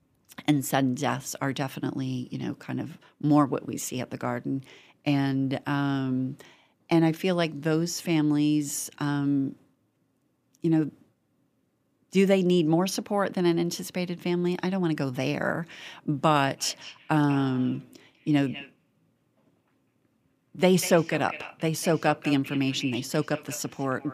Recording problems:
echo of what is said; noticeable; from 17 s on; 200 ms later, 15 dB below the speech

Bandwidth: 15 kHz